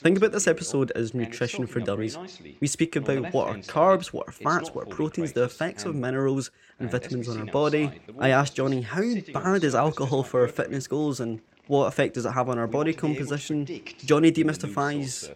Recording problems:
voice in the background; noticeable; throughout; 15 dB below the speech

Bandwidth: 16 kHz